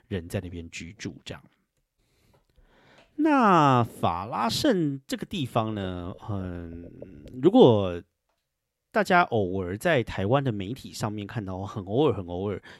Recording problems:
none

